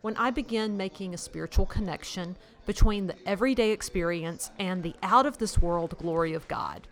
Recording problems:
murmuring crowd; faint; throughout; 25 dB below the speech

